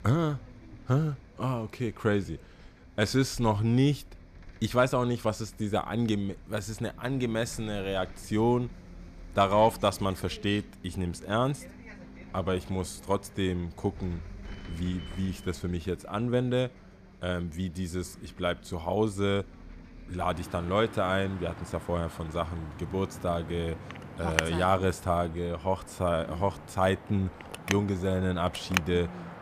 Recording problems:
traffic noise; noticeable; throughout; 15 dB below the speech

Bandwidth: 14.5 kHz